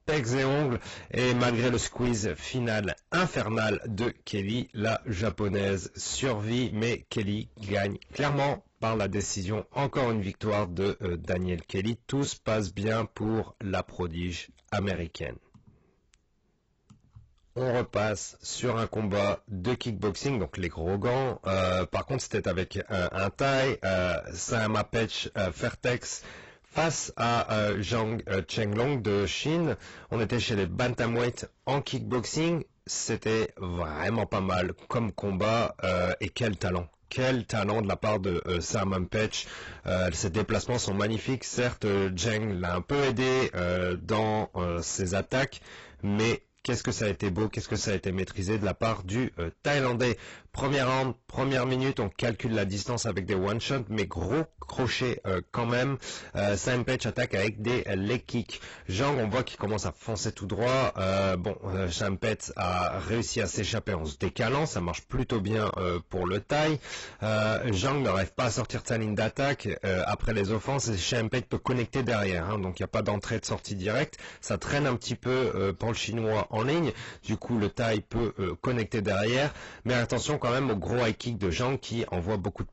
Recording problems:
distortion; heavy; 17% of the sound clipped
garbled, watery; badly; nothing above 7.5 kHz

